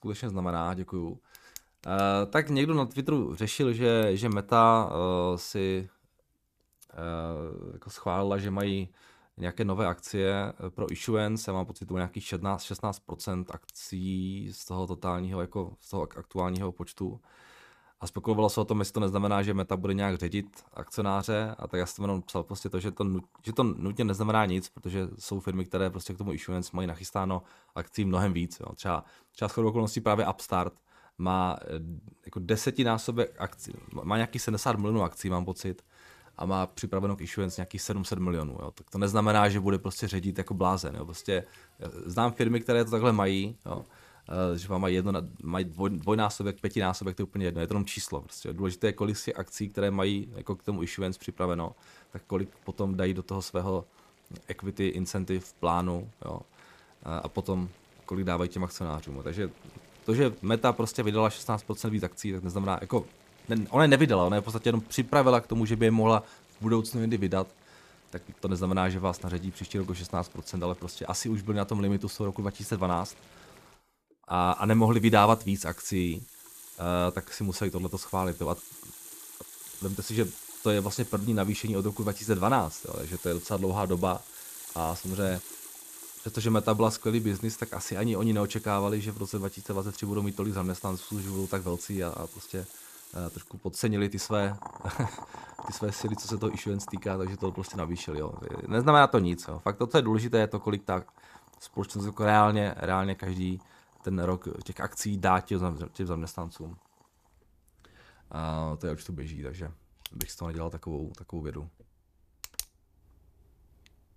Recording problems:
household noises; noticeable; throughout; 15 dB below the speech

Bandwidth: 14.5 kHz